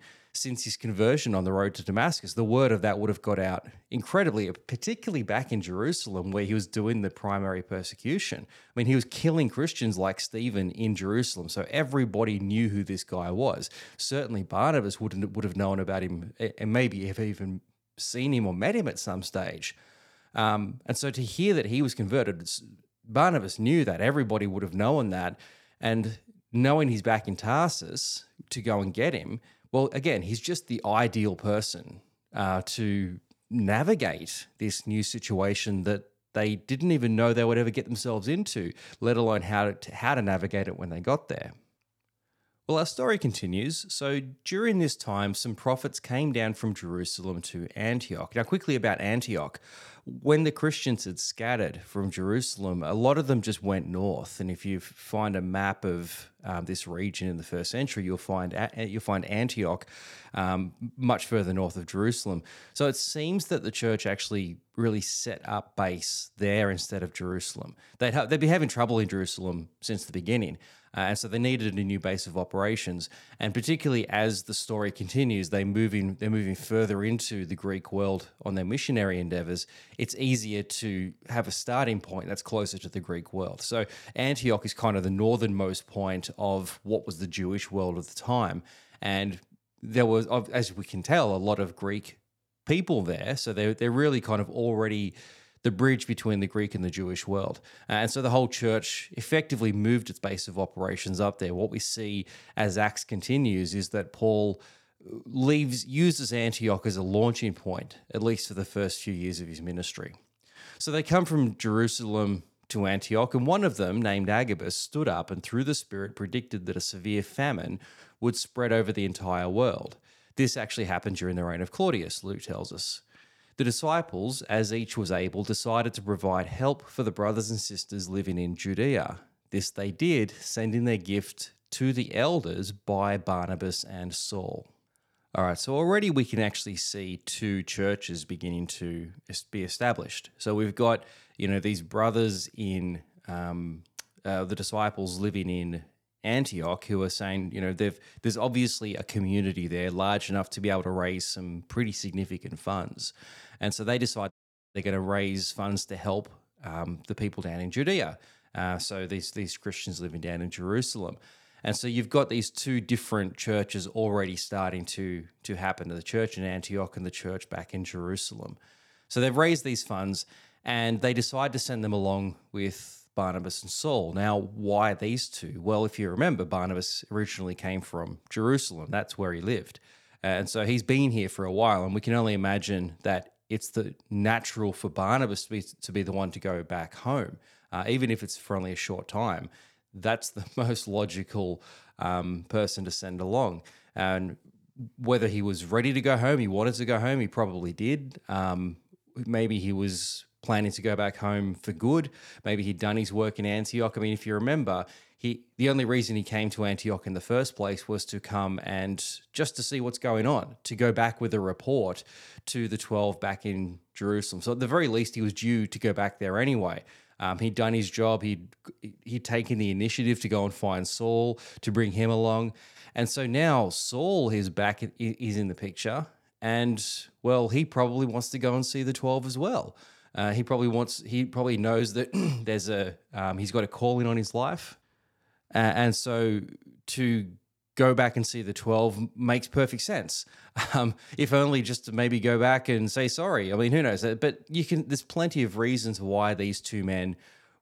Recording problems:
audio cutting out; at 2:34

